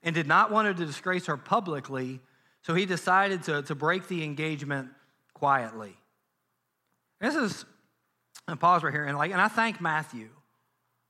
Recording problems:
none

